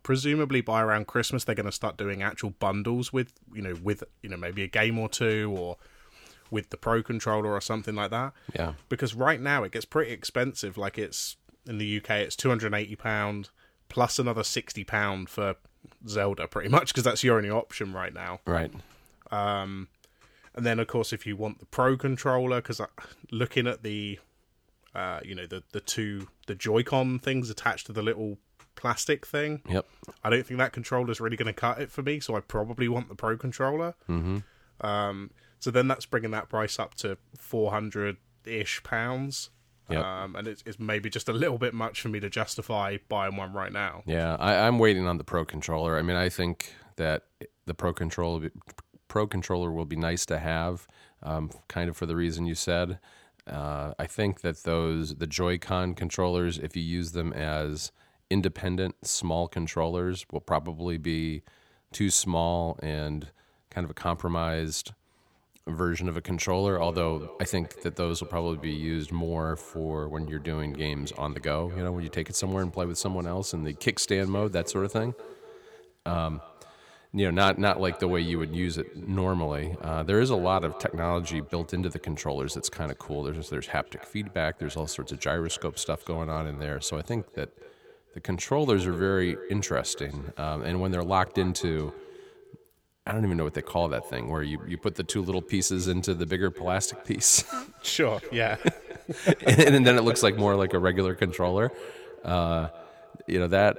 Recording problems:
echo of what is said; noticeable; from 1:07 on; 230 ms later, 15 dB below the speech

